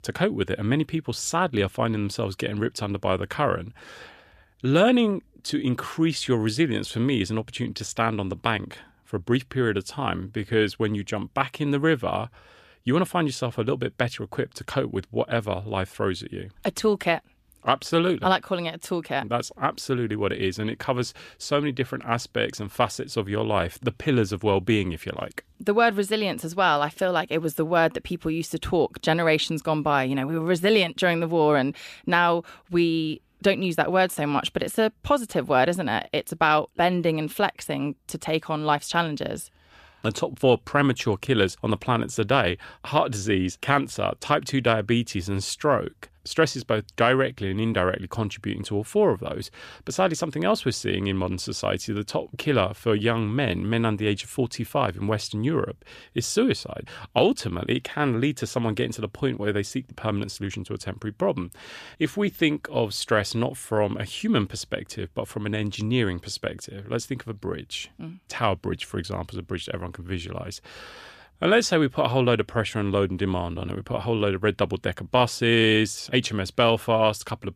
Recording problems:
none

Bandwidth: 14.5 kHz